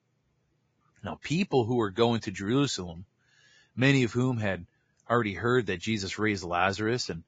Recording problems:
garbled, watery; badly; nothing above 7.5 kHz

